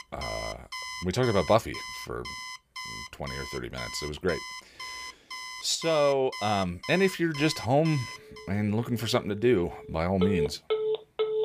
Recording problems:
alarms or sirens; loud; throughout; 8 dB below the speech

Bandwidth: 15 kHz